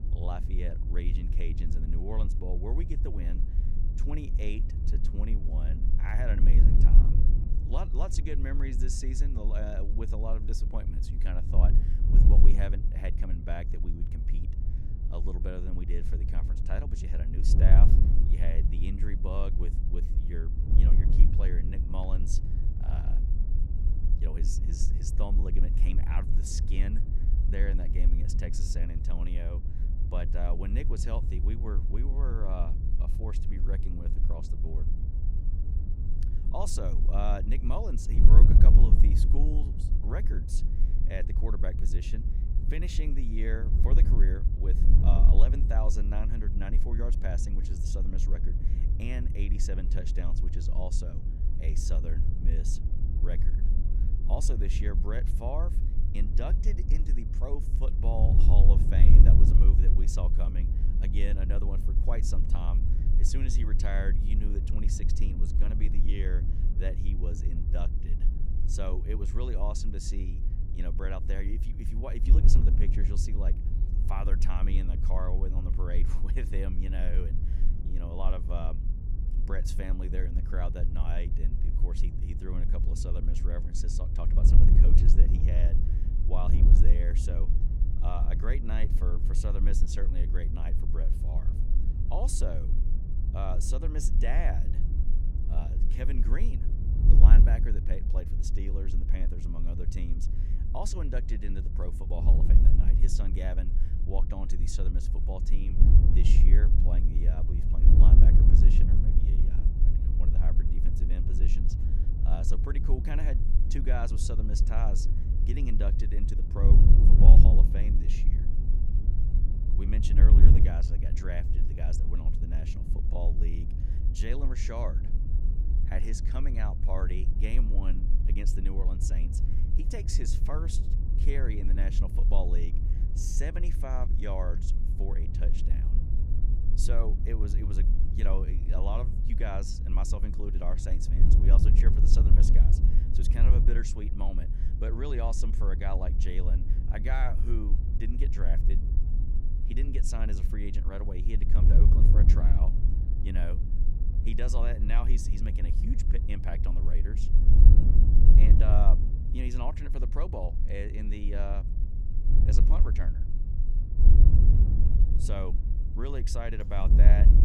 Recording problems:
wind noise on the microphone; heavy; 4 dB below the speech

